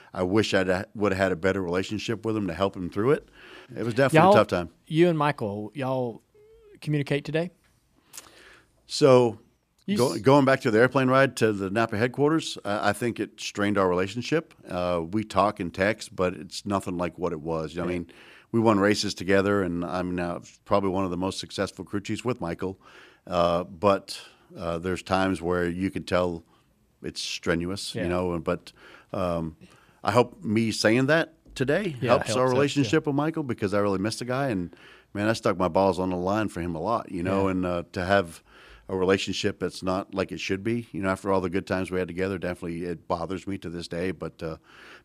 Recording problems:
none

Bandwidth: 14.5 kHz